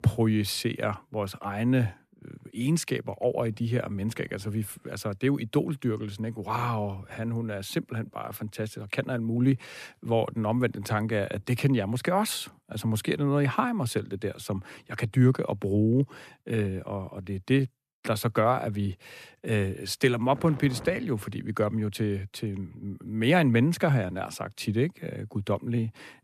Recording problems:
none

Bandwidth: 14.5 kHz